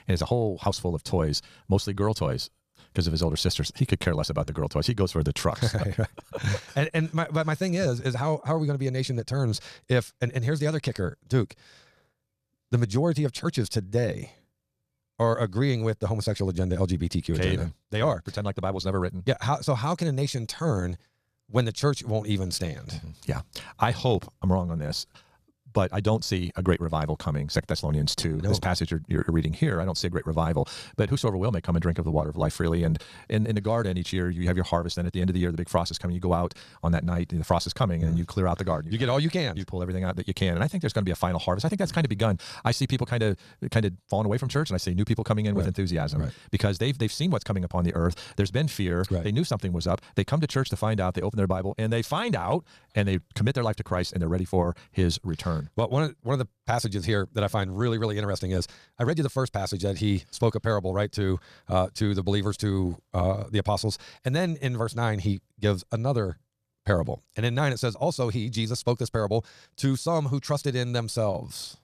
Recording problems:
wrong speed, natural pitch; too fast; 1.6 times normal speed

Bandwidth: 14.5 kHz